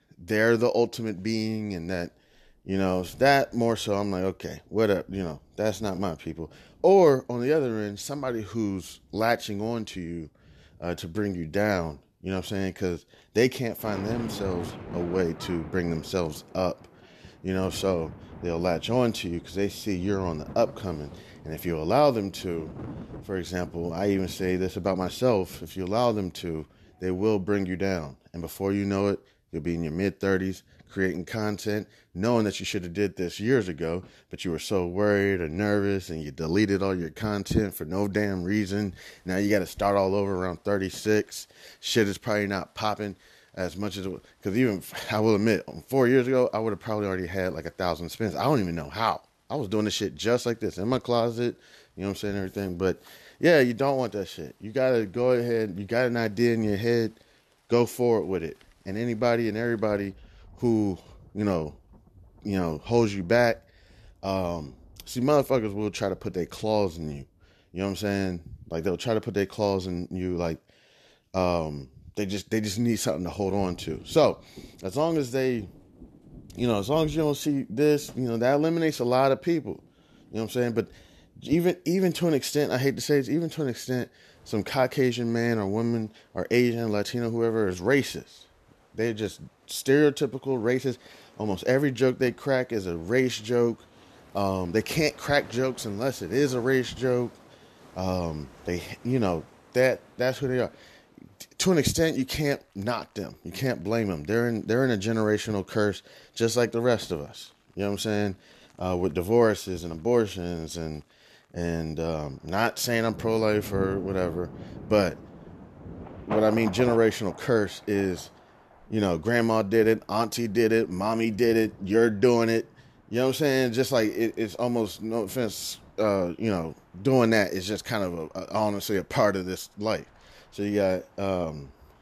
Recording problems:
rain or running water; noticeable; throughout; 20 dB below the speech

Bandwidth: 13.5 kHz